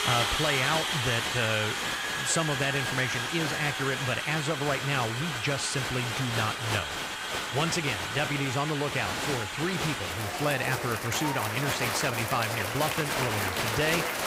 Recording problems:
crowd noise; very loud; throughout; as loud as the speech

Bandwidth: 15.5 kHz